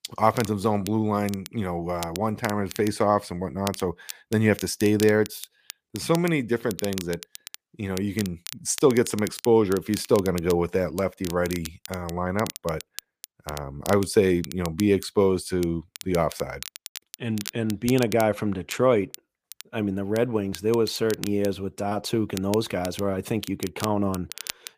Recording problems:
crackle, like an old record; noticeable; 15 dB below the speech

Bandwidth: 15 kHz